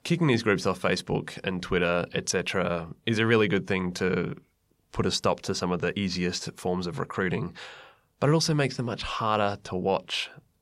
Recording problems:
none

